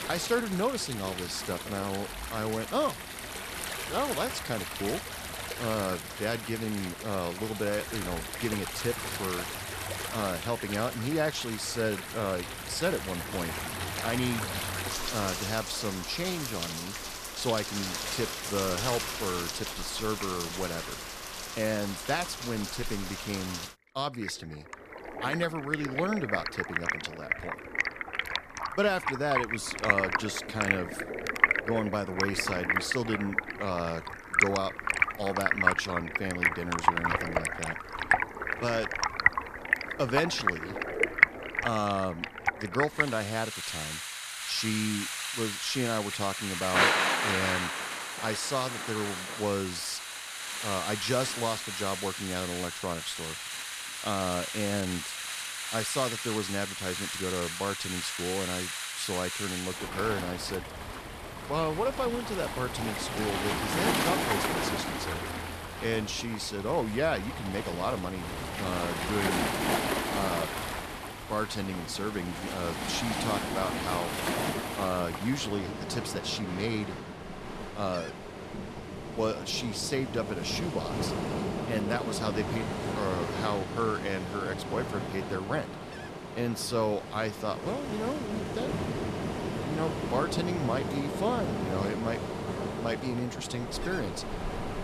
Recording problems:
rain or running water; very loud; throughout; as loud as the speech

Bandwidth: 14.5 kHz